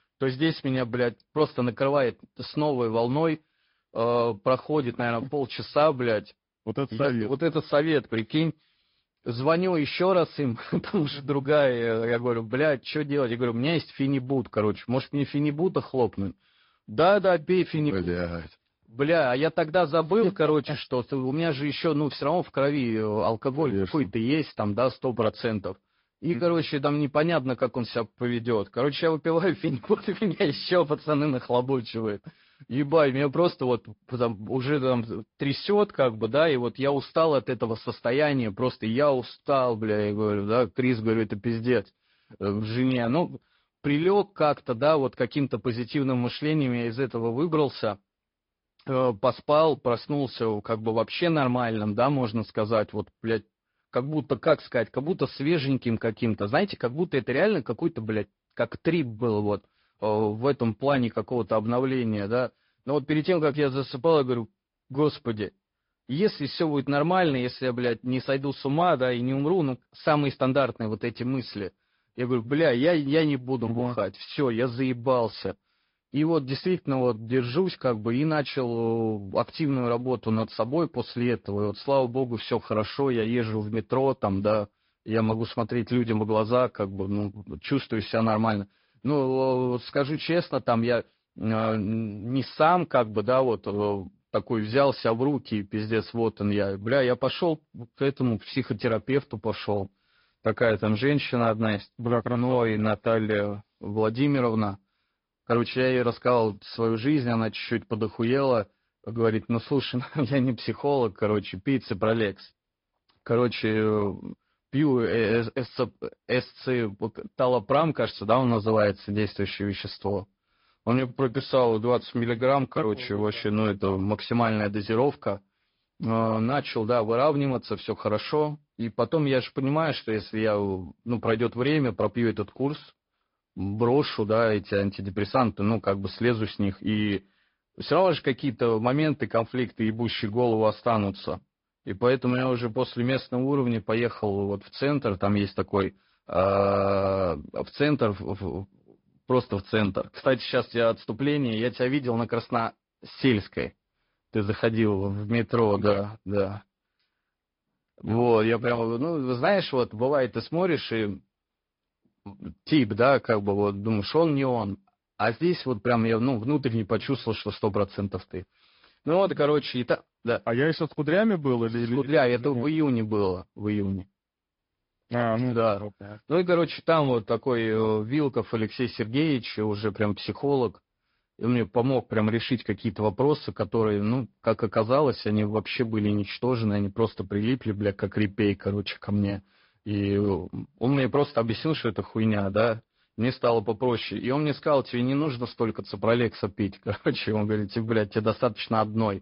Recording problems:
high frequencies cut off; noticeable; nothing above 5 kHz
garbled, watery; slightly

